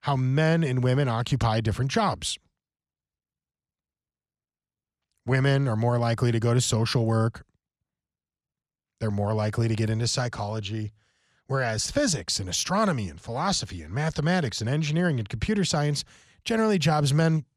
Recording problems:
none

